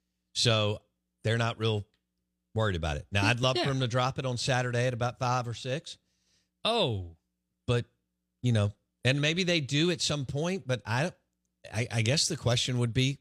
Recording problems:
none

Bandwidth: 14.5 kHz